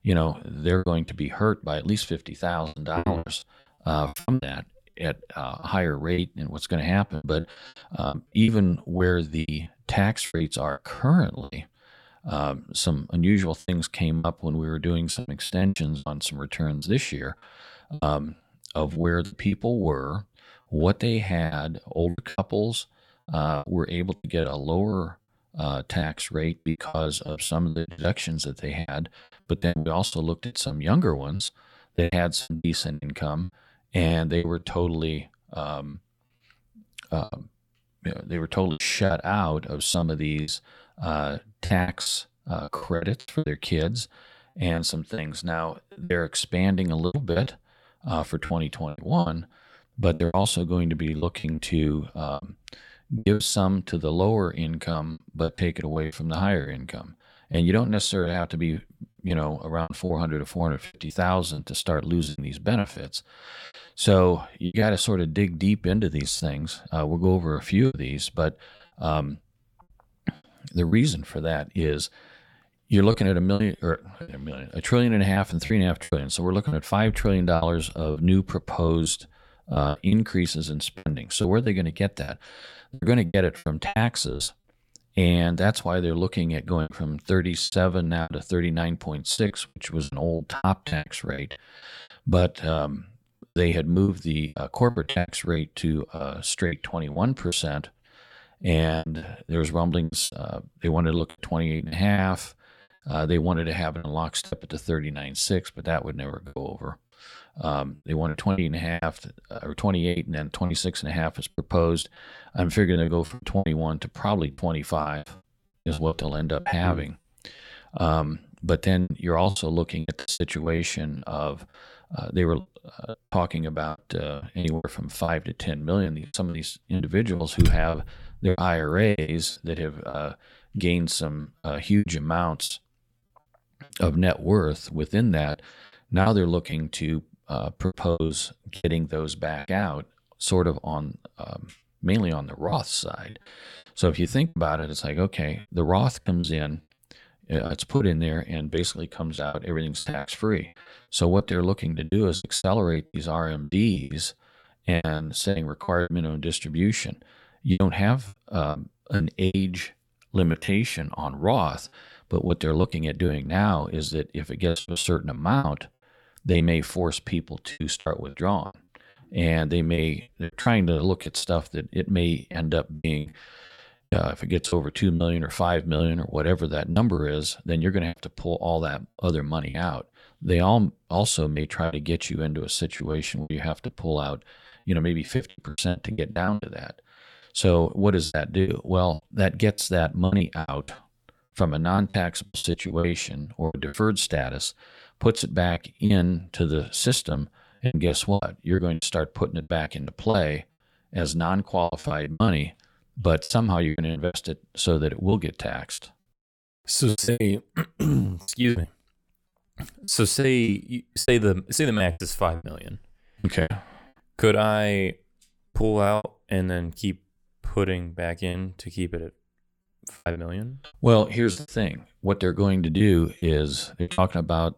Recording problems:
choppy; very; 12% of the speech affected

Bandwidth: 18.5 kHz